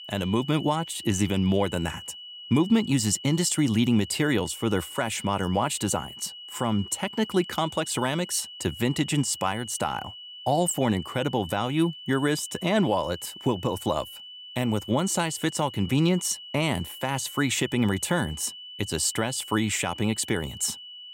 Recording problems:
high-pitched whine; noticeable; throughout; 3 kHz, 15 dB below the speech

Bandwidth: 16 kHz